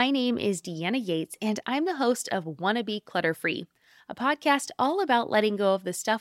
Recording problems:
abrupt cut into speech; at the start

